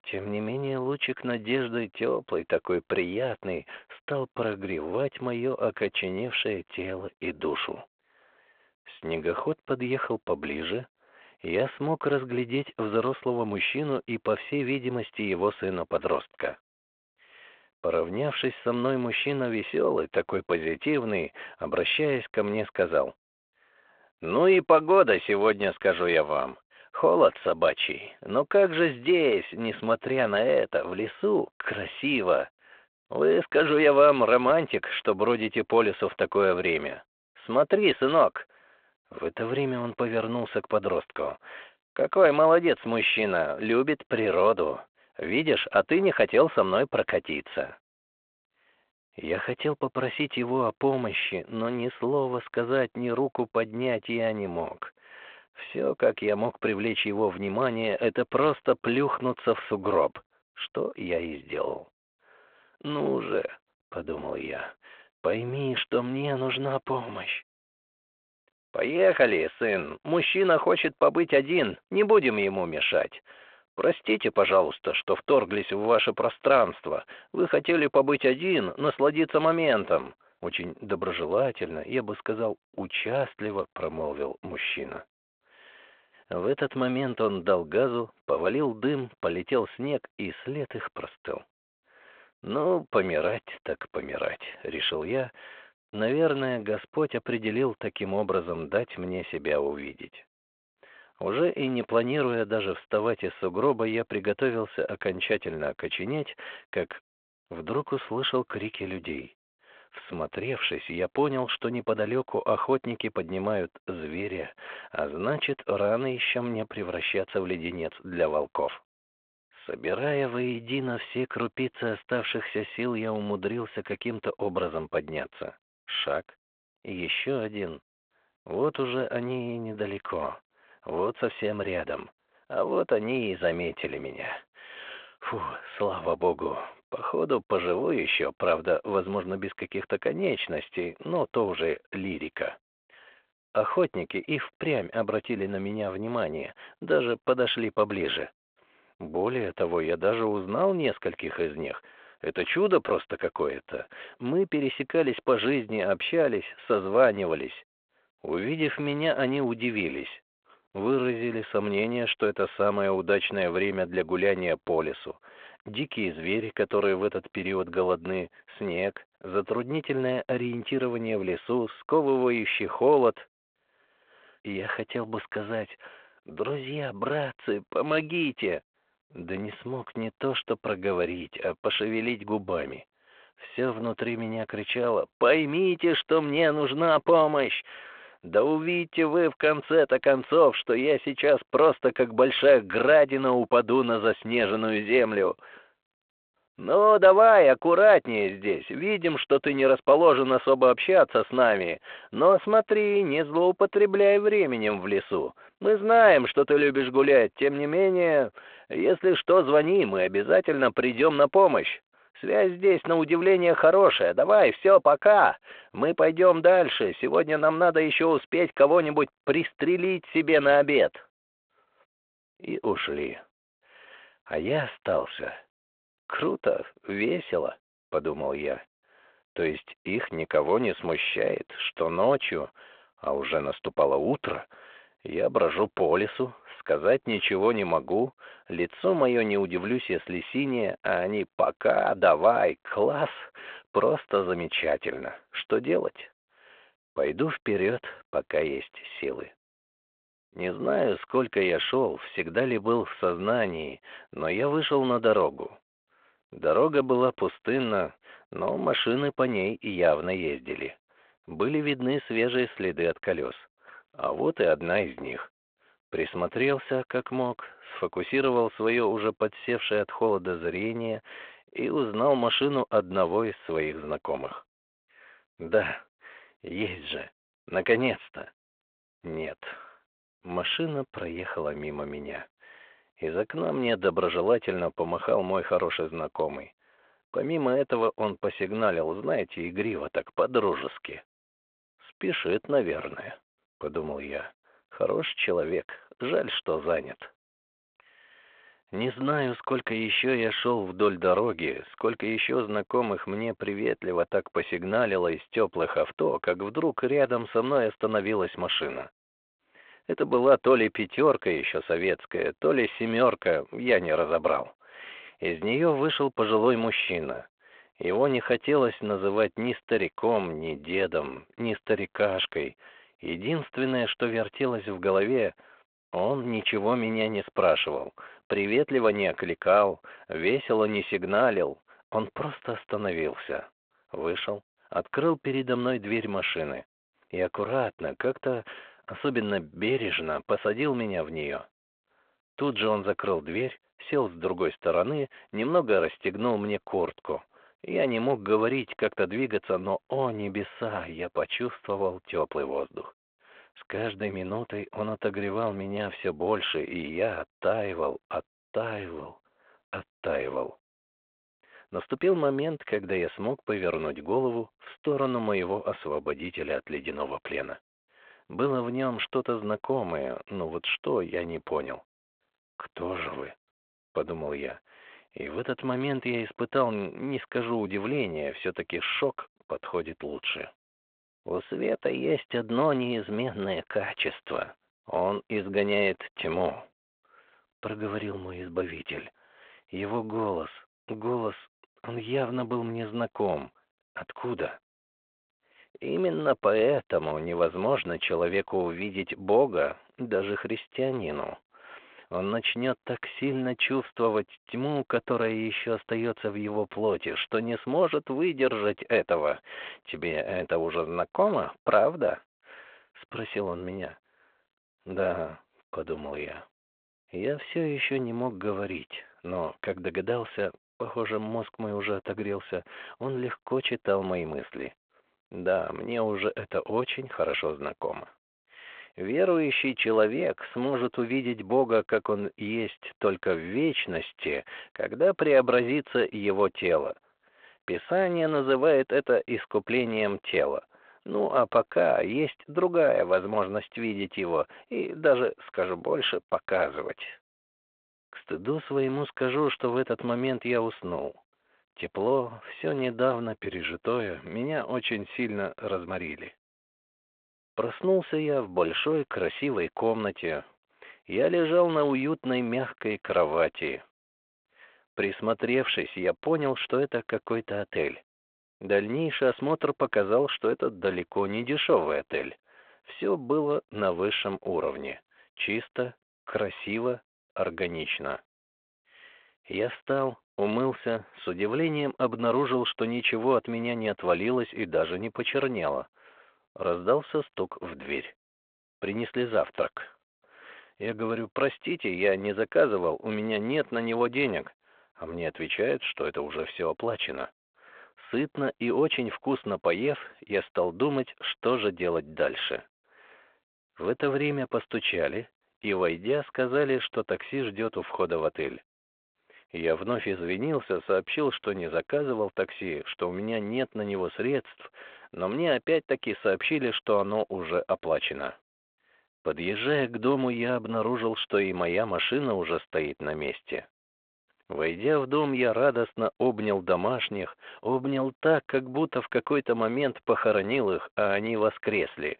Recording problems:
phone-call audio

